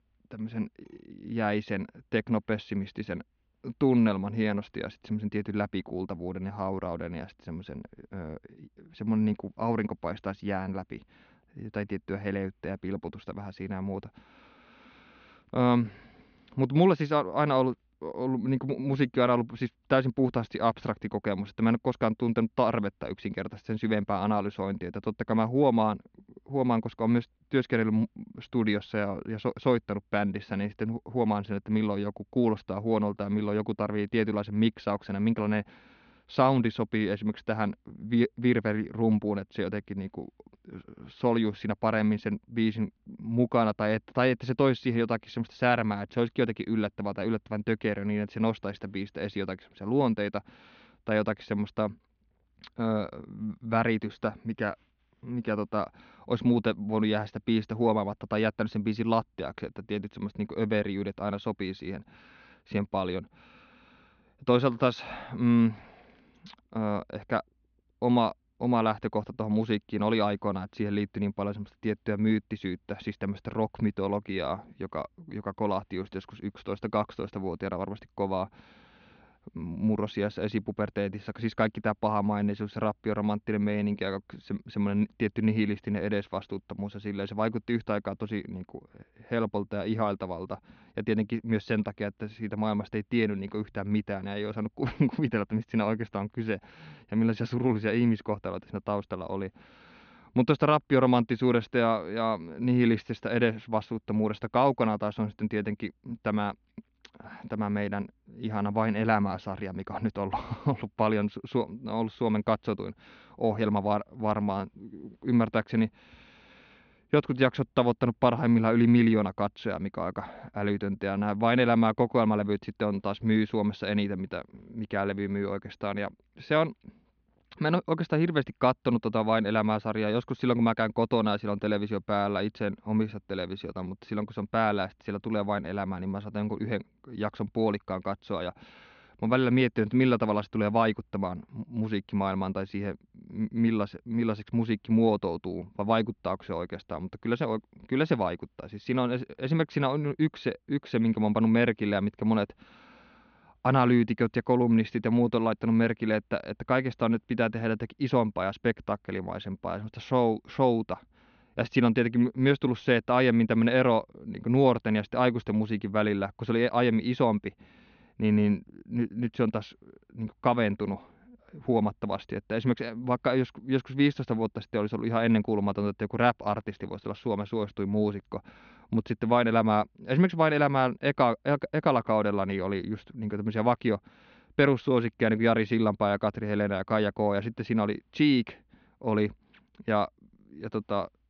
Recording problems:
muffled; very slightly; fading above 3.5 kHz
high frequencies cut off; slight; nothing above 6.5 kHz

